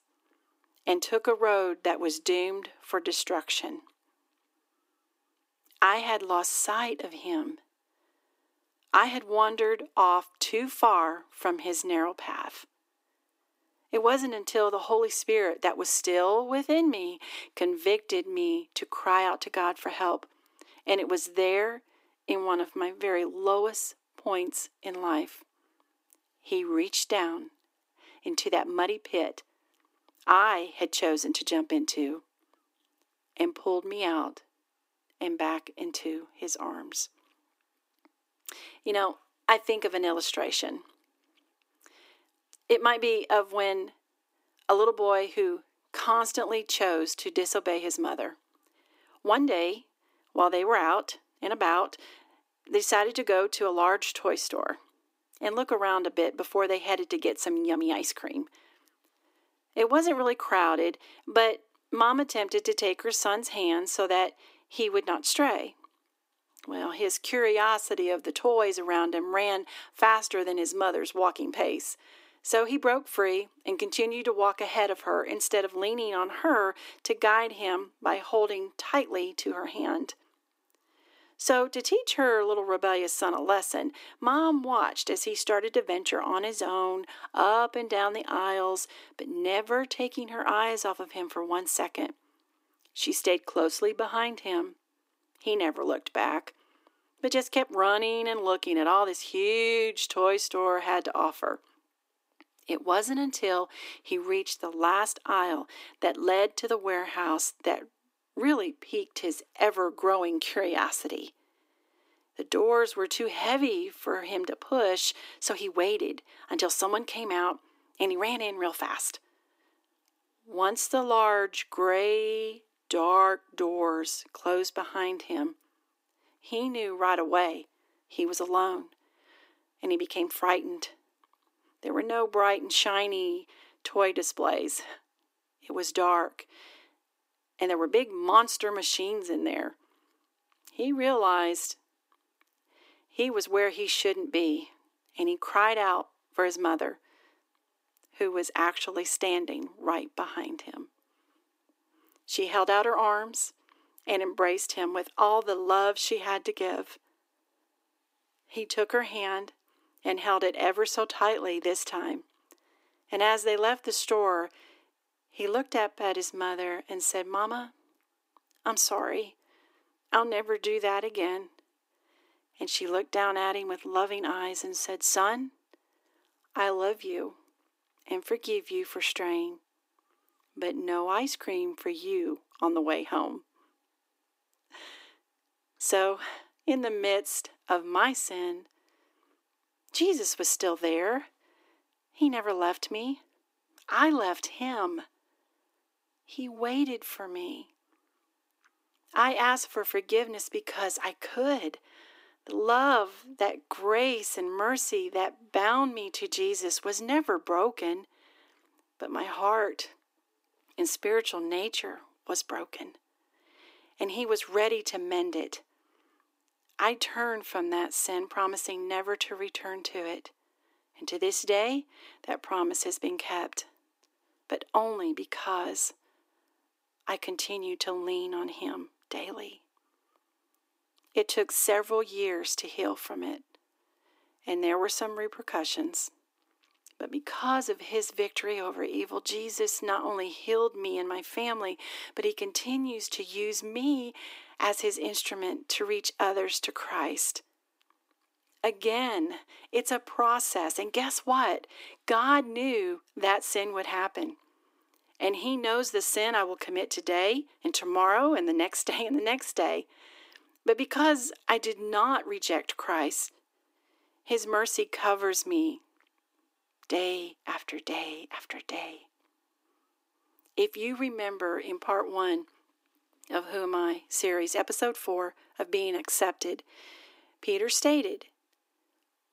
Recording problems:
thin; somewhat; fading below 300 Hz

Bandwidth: 15.5 kHz